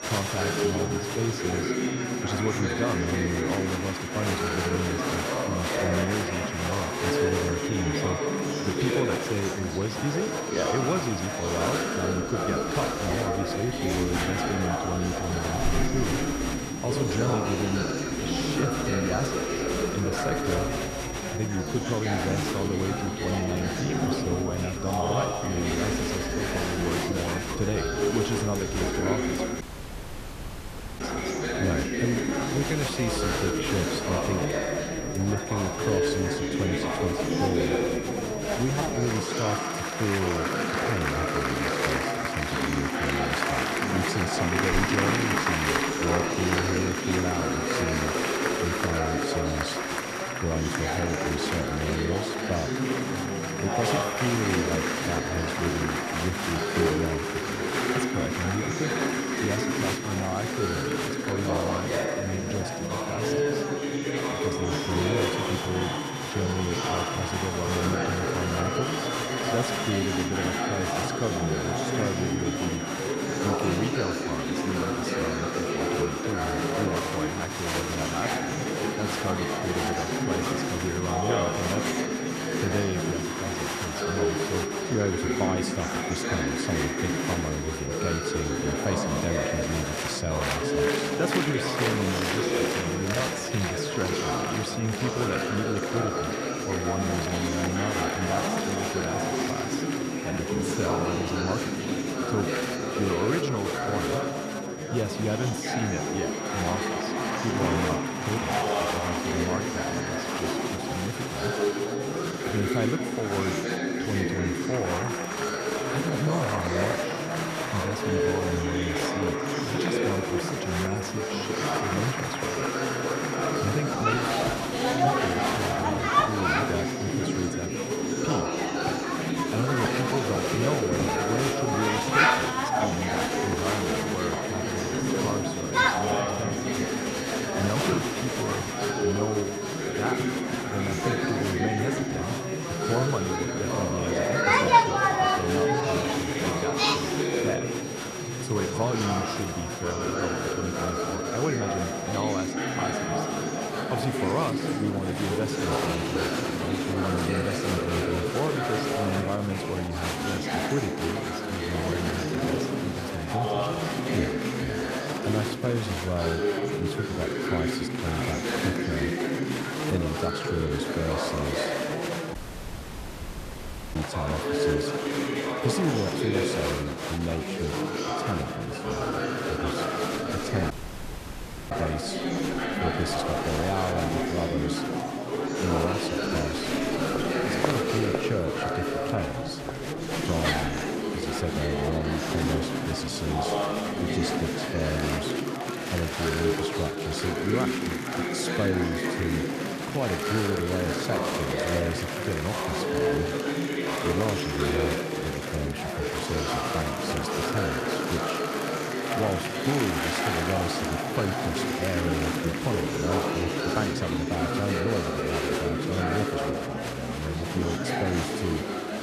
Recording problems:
chatter from many people; very loud; throughout; 4 dB above the speech
high-pitched whine; loud; until 2:34; 5.5 kHz, 9 dB below the speech
audio cutting out; at 30 s for 1.5 s, at 2:52 for 1.5 s and at 3:01 for 1 s

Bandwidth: 14.5 kHz